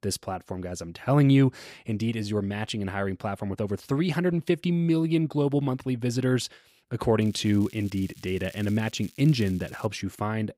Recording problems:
crackling; faint; from 7 to 10 s; 25 dB below the speech

